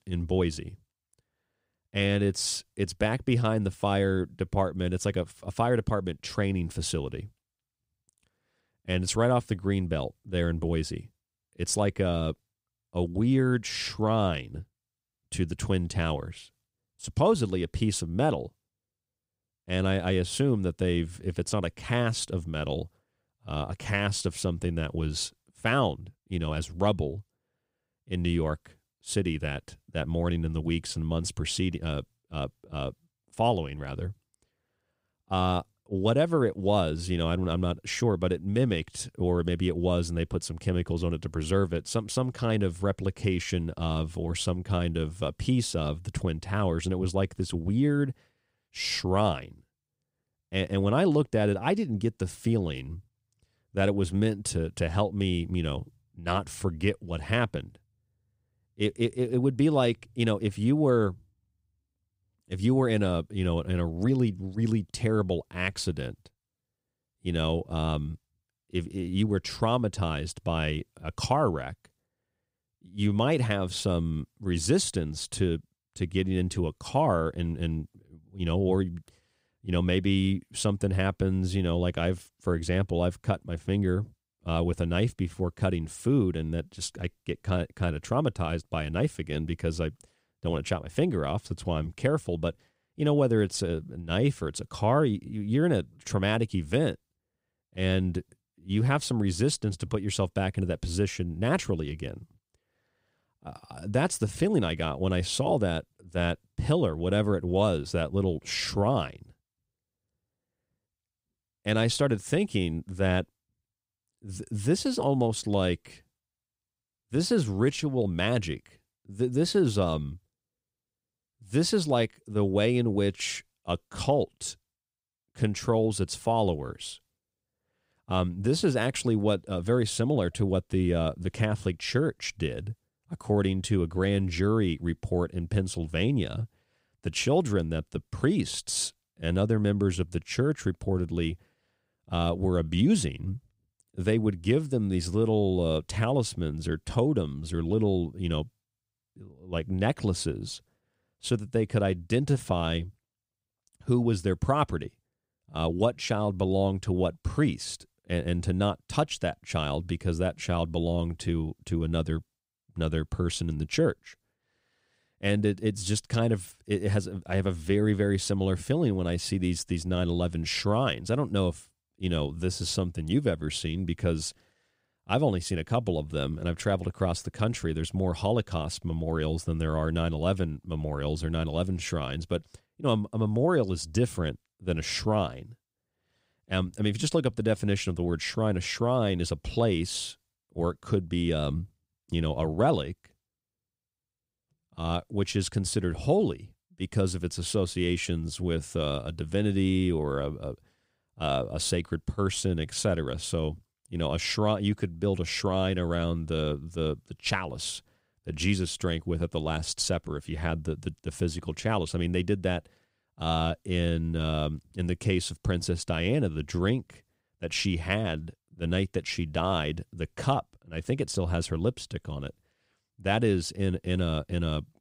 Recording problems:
none

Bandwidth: 15.5 kHz